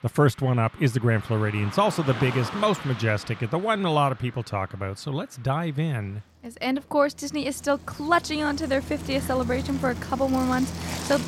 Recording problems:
traffic noise; noticeable; throughout; 10 dB below the speech

